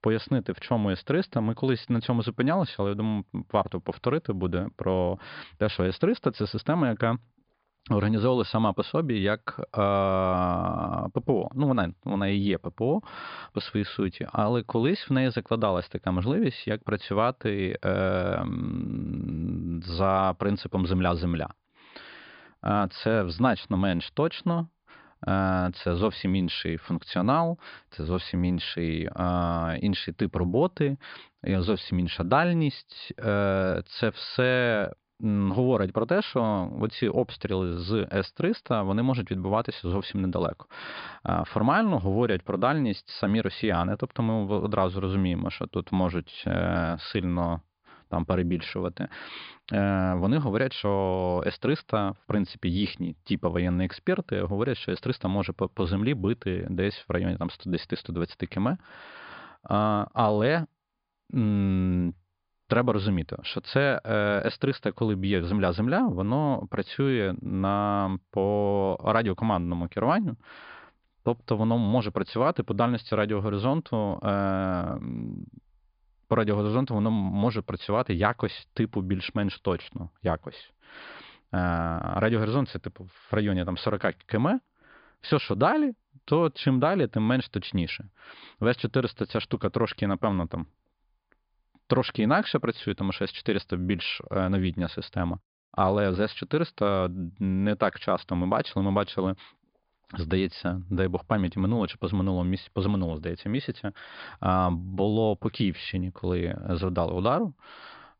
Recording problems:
high frequencies cut off; severe; nothing above 5 kHz

